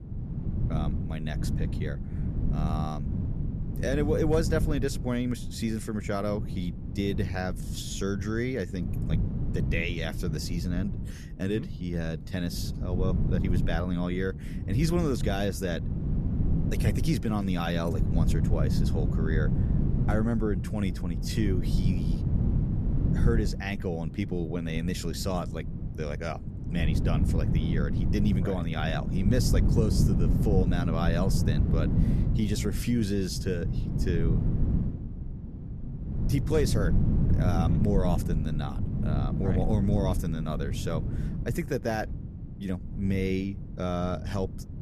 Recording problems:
low rumble; loud; throughout; 6 dB below the speech

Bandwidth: 14.5 kHz